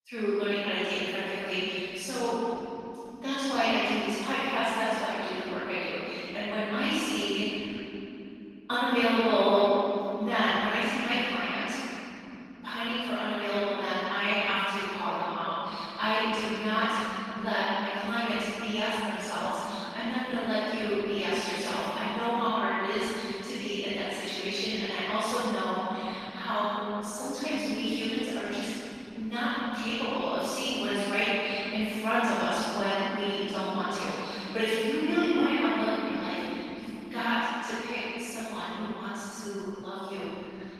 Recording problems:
room echo; strong; dies away in 3 s
off-mic speech; far
garbled, watery; slightly; nothing above 14.5 kHz
thin; very slightly; fading below 650 Hz

